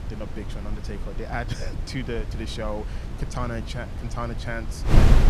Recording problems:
wind noise on the microphone; heavy; 4 dB below the speech

